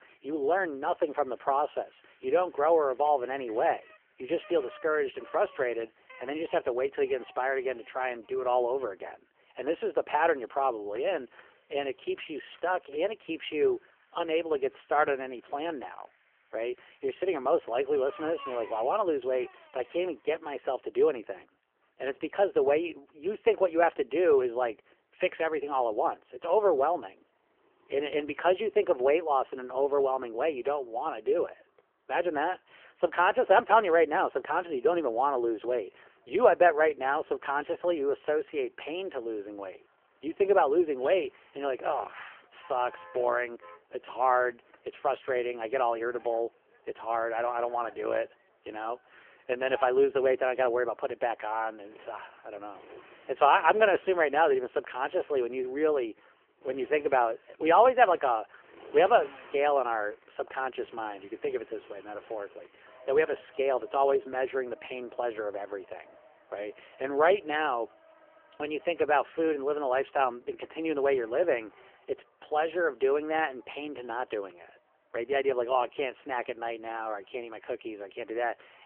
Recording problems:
phone-call audio; poor line; nothing above 3 kHz
traffic noise; faint; throughout; 25 dB below the speech

